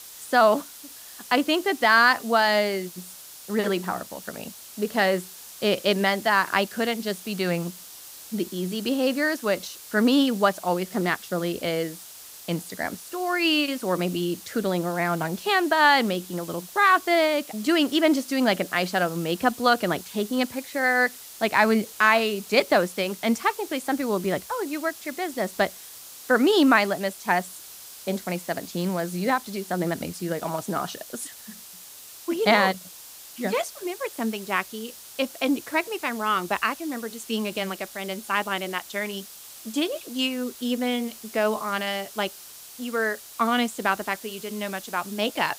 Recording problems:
hiss; noticeable; throughout; 15 dB below the speech

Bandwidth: 15.5 kHz